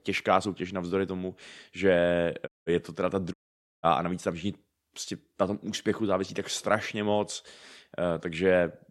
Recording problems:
audio cutting out; at 2.5 s and at 3.5 s

